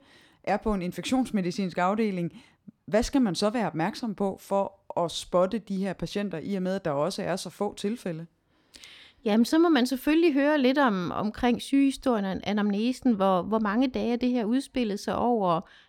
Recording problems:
none

